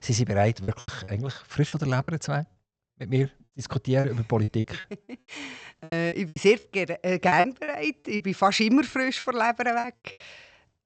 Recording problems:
high frequencies cut off; noticeable; nothing above 8 kHz
choppy; very; from 0.5 to 2 s, from 4 to 6.5 s and from 7.5 to 10 s; 13% of the speech affected

